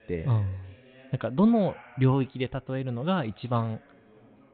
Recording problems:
high frequencies cut off; severe; nothing above 4 kHz
background chatter; faint; throughout; 2 voices, 25 dB below the speech

